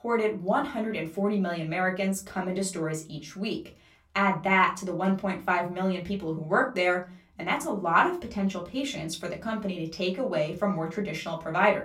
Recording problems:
off-mic speech; far
room echo; very slight; dies away in 0.3 s

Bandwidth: 16 kHz